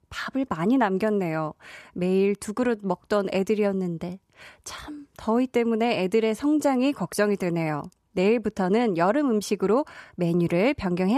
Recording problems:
abrupt cut into speech; at the end

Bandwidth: 14 kHz